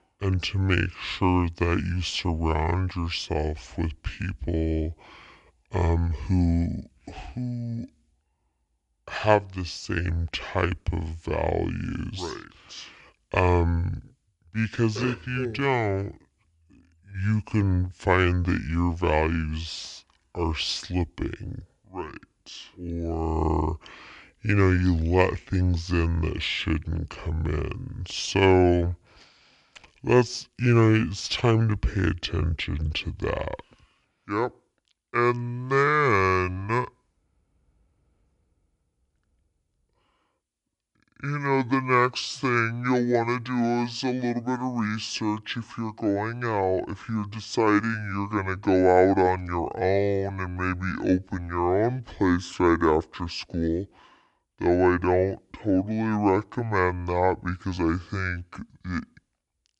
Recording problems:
wrong speed and pitch; too slow and too low; 0.6 times normal speed

